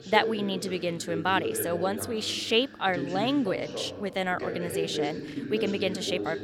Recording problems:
voice in the background; loud; throughout; 6 dB below the speech
choppy; occasionally; at 5.5 s; 1% of the speech affected

